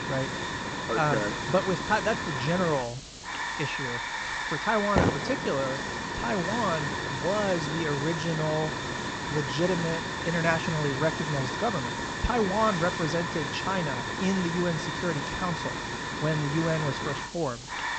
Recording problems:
high frequencies cut off; noticeable; nothing above 8 kHz
hiss; loud; throughout; 2 dB below the speech

